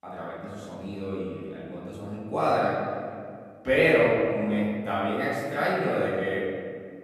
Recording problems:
room echo; strong; dies away in 2 s
off-mic speech; far

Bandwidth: 13.5 kHz